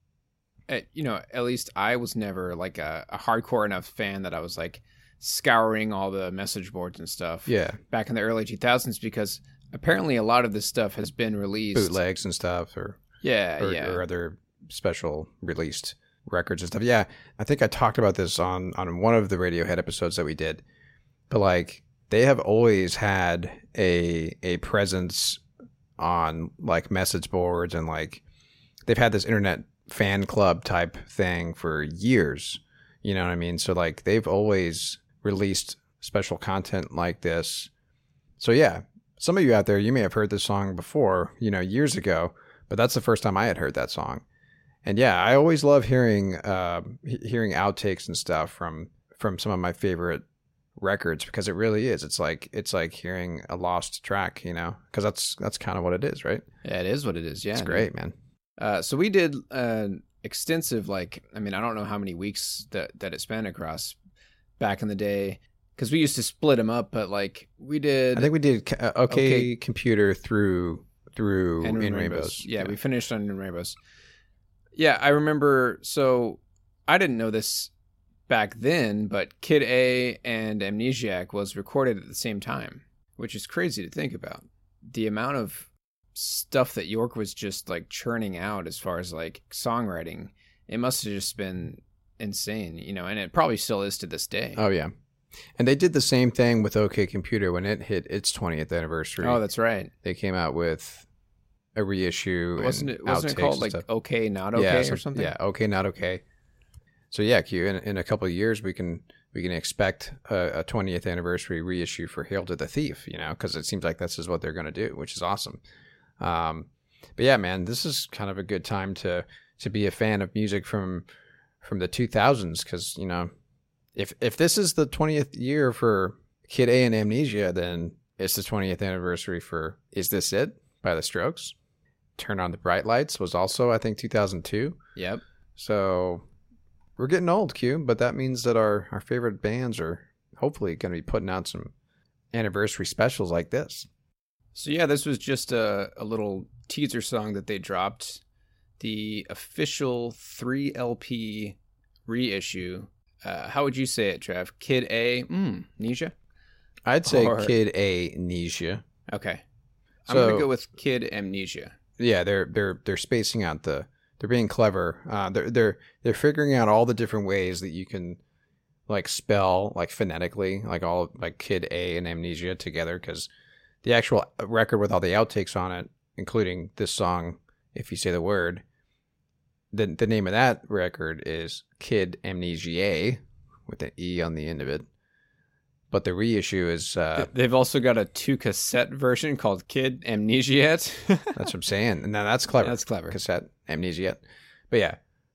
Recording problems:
none

